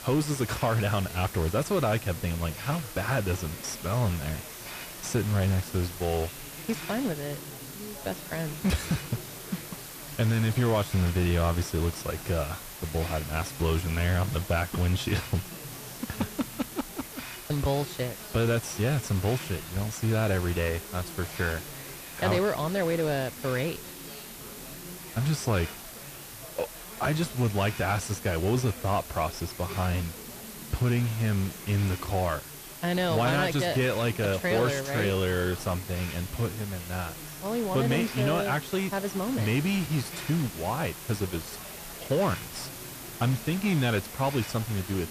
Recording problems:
distortion; slight; 10 dB below the speech
background chatter; noticeable; throughout; 4 voices, 20 dB below the speech
hiss; noticeable; throughout; 10 dB below the speech

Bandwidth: 14.5 kHz